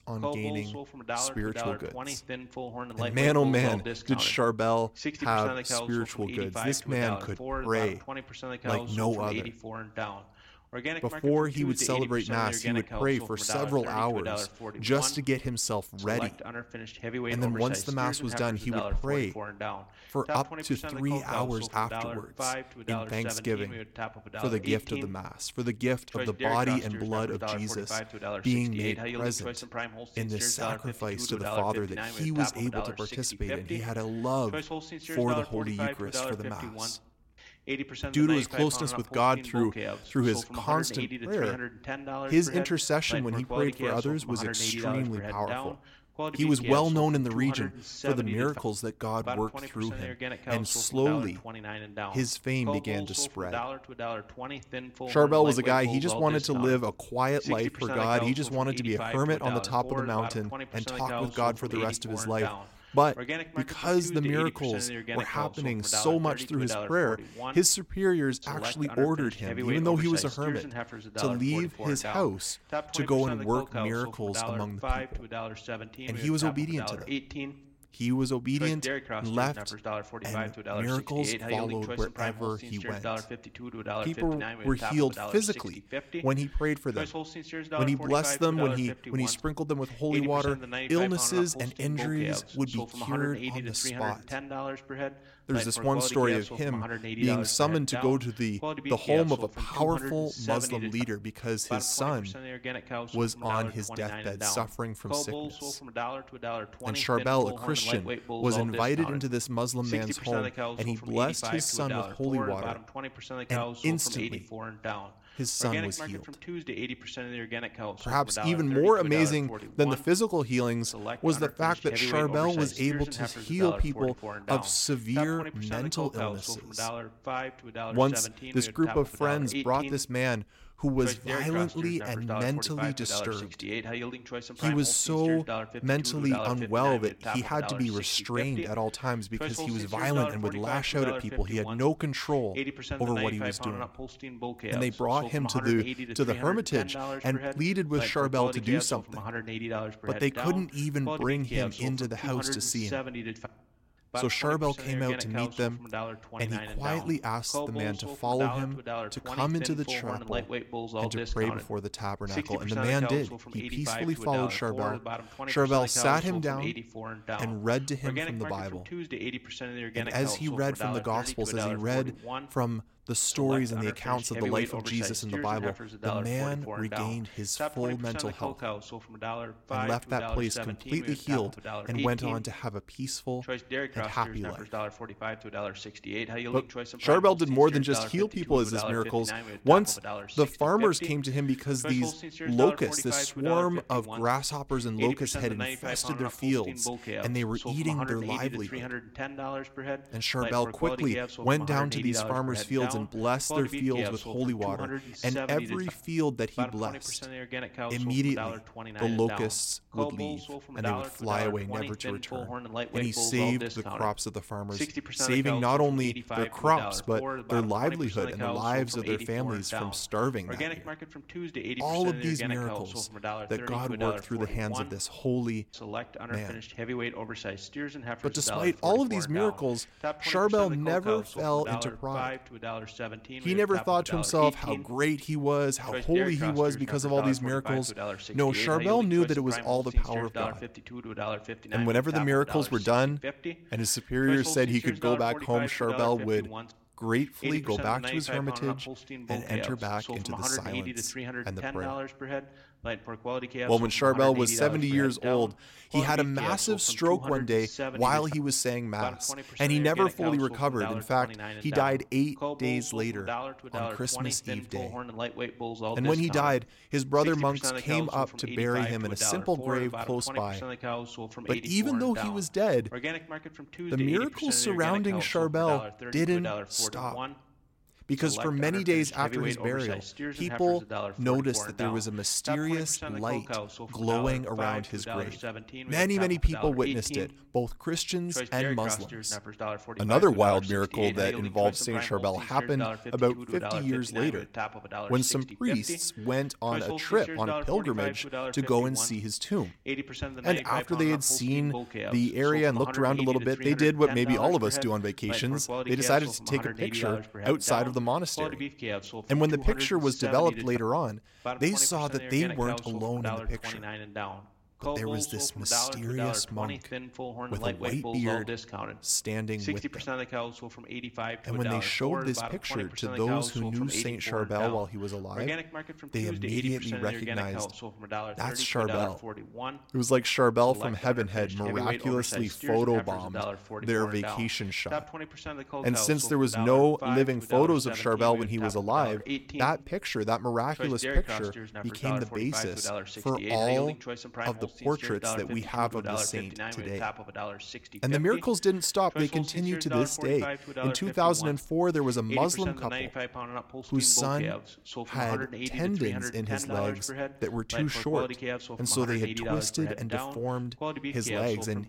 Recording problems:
voice in the background; loud; throughout; 8 dB below the speech

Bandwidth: 16.5 kHz